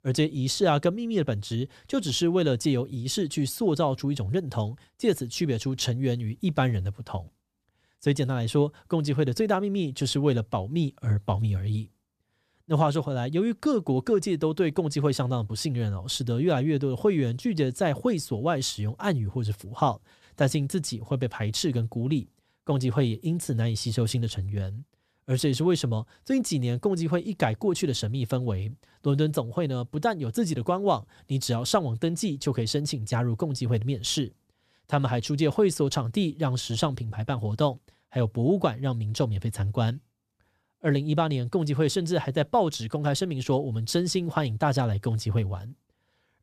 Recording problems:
none

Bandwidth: 14.5 kHz